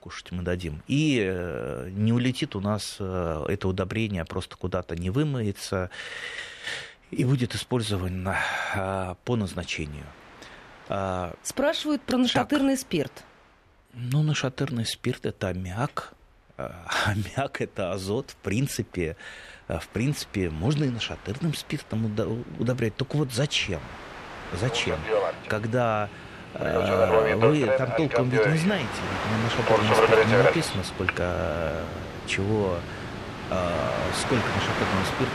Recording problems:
train or aircraft noise; very loud; throughout; 1 dB above the speech

